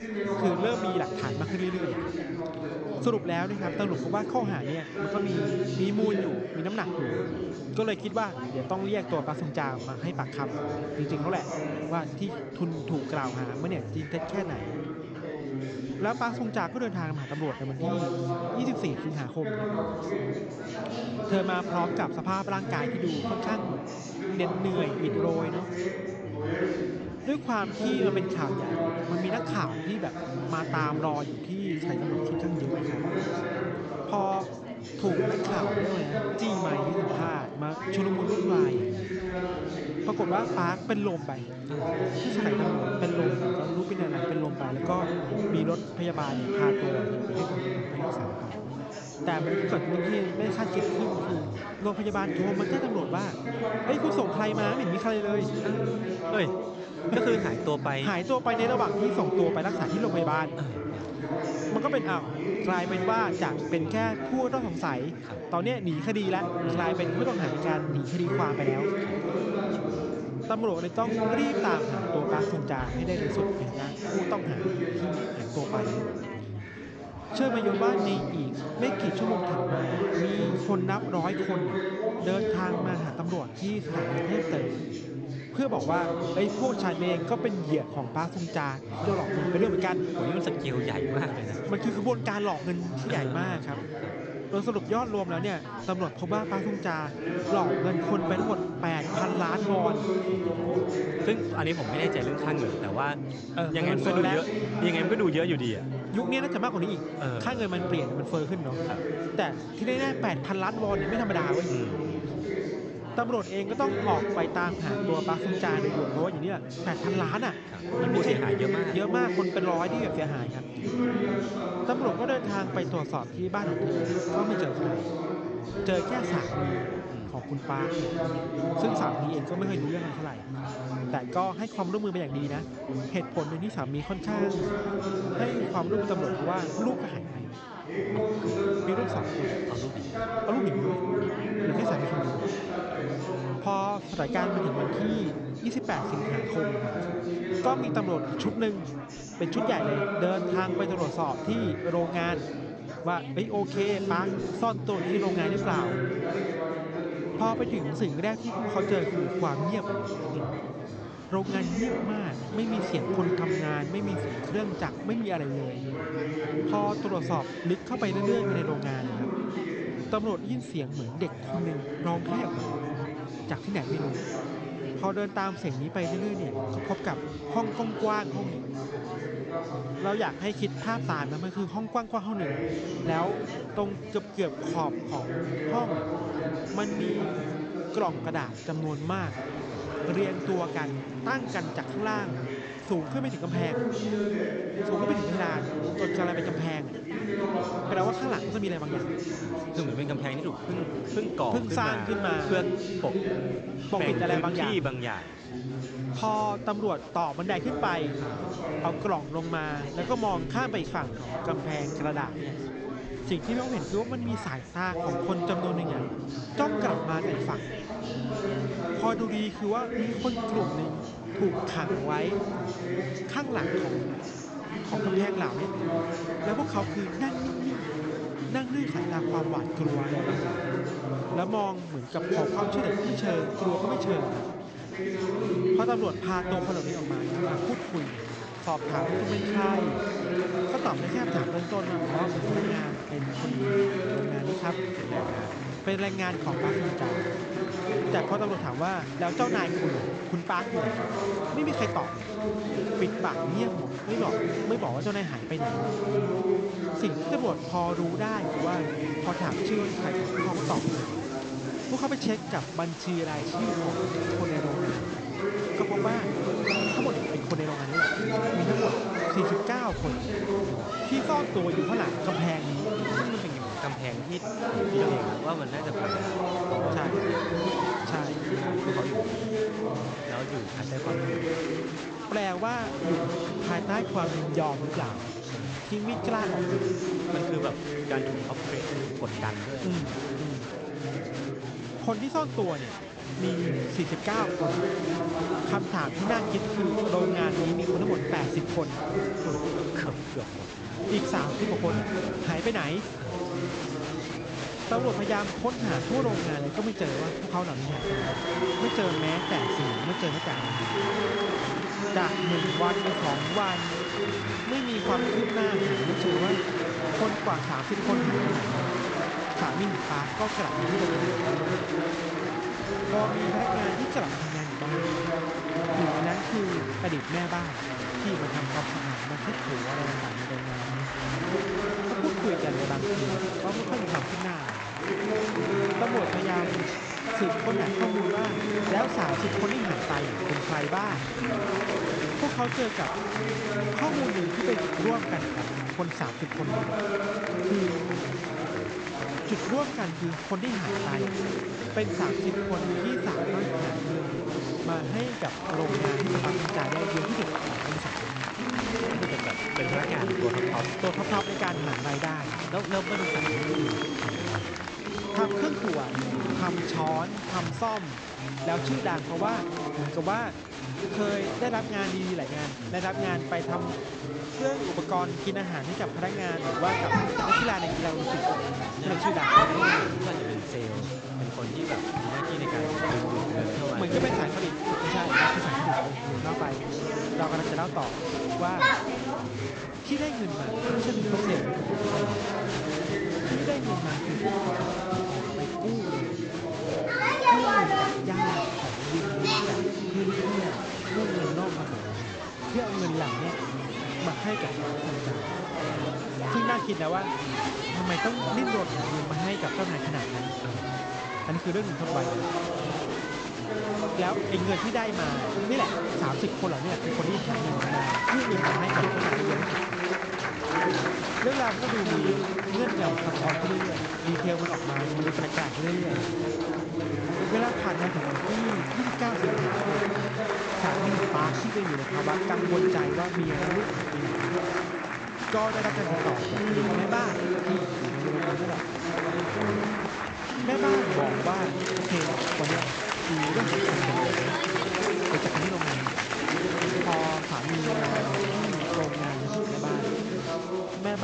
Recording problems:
high frequencies cut off; noticeable; nothing above 8 kHz
chatter from many people; very loud; throughout; 2 dB above the speech
abrupt cut into speech; at the end

